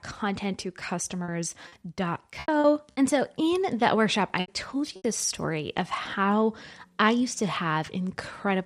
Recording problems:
choppy; very; from 1 to 2.5 s and at 4.5 s; 12% of the speech affected

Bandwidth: 14.5 kHz